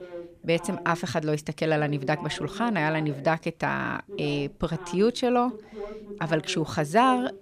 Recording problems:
voice in the background; noticeable; throughout; 15 dB below the speech

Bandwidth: 14.5 kHz